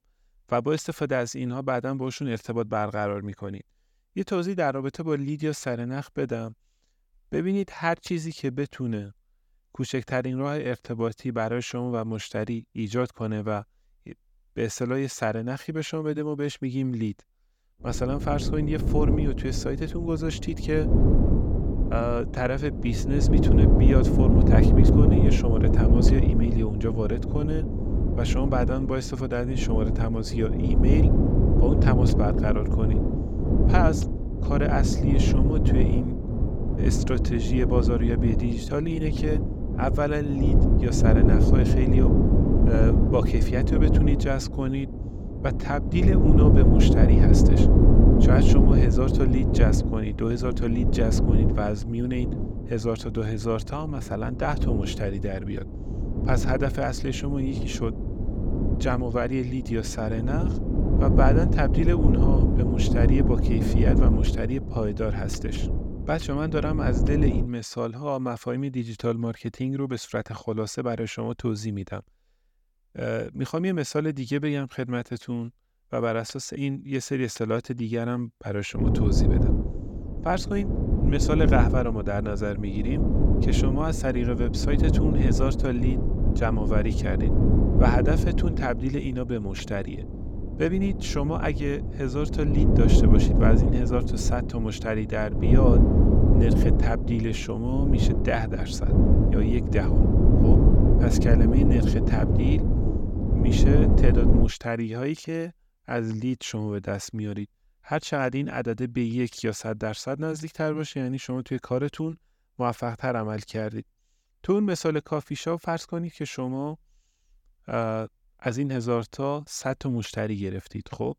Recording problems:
wind noise on the microphone; heavy; from 18 s to 1:07 and from 1:19 to 1:44; 1 dB below the speech

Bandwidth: 17.5 kHz